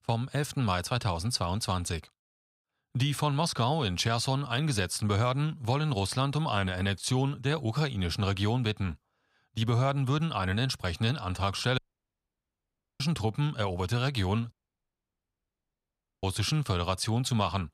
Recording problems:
audio cutting out; at 12 s for 1 s and at 15 s for 1.5 s

